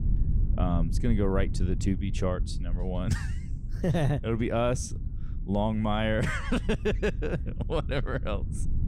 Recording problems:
low rumble; noticeable; throughout; 15 dB below the speech

